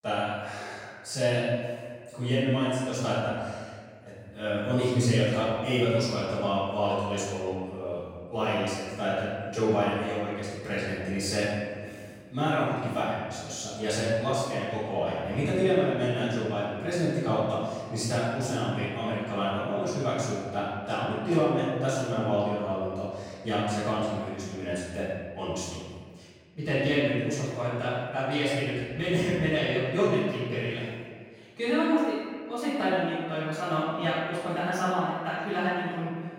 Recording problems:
room echo; strong; dies away in 1.7 s
off-mic speech; far

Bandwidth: 16.5 kHz